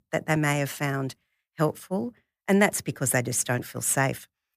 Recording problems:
none

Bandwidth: 15 kHz